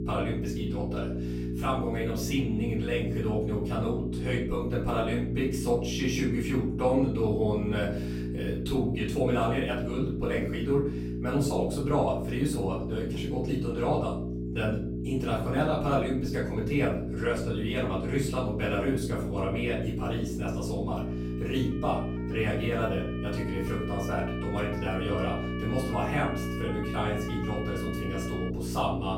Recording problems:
off-mic speech; far
room echo; slight; dies away in 0.4 s
electrical hum; loud; throughout; 60 Hz, 7 dB below the speech
siren; noticeable; from 21 to 29 s; peak 9 dB below the speech

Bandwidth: 16 kHz